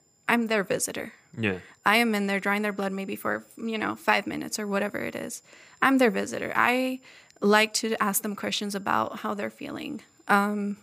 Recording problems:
high-pitched whine; faint; throughout; 7 kHz, 35 dB below the speech

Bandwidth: 15 kHz